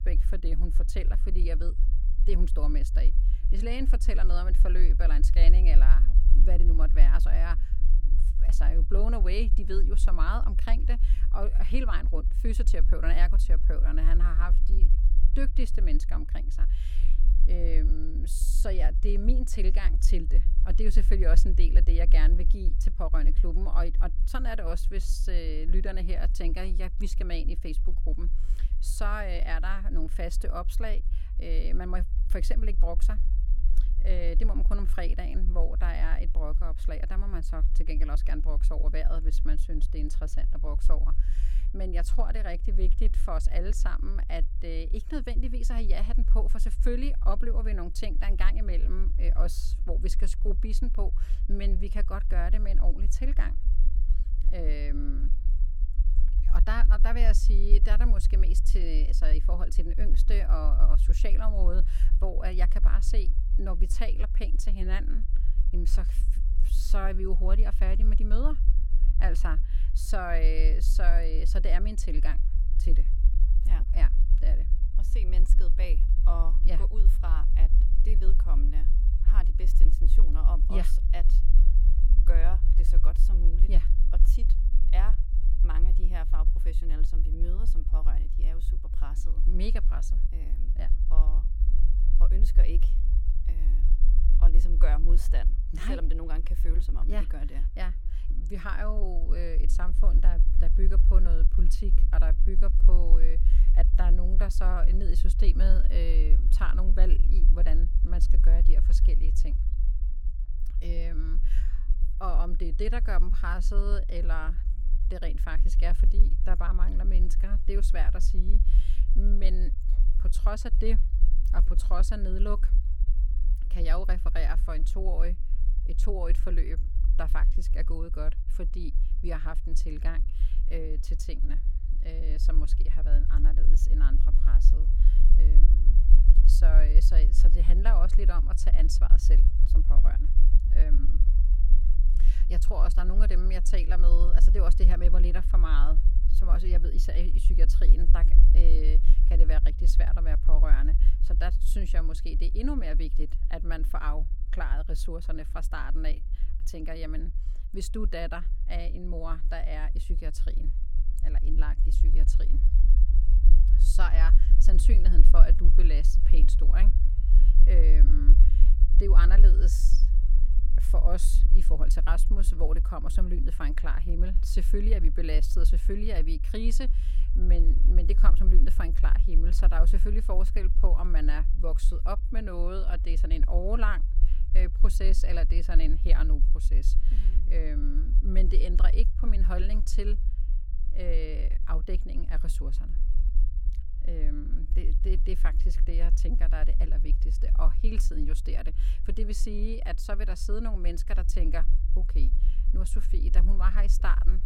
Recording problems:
low rumble; noticeable; throughout; 10 dB below the speech

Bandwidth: 17 kHz